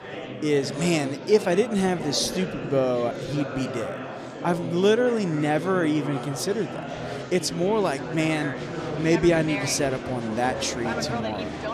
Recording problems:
murmuring crowd; loud; throughout; 7 dB below the speech

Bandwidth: 15.5 kHz